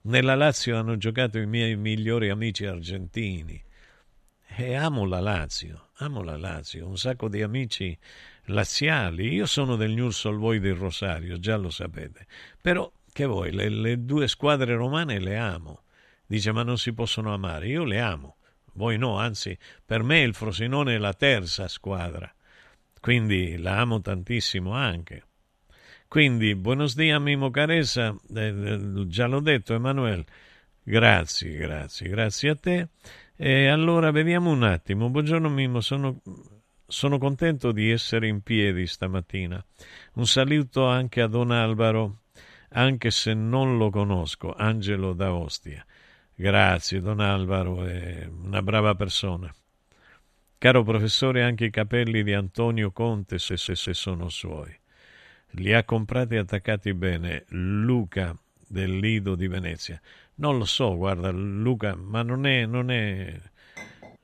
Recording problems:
audio stuttering; at 53 s
clattering dishes; faint; at 1:04; peak 20 dB below the speech

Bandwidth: 14 kHz